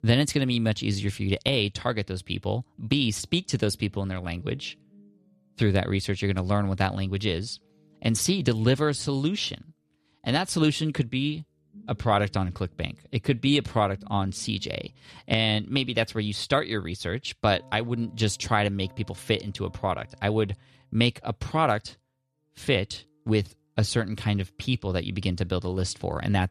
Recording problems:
background music; faint; throughout; 30 dB below the speech

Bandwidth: 13.5 kHz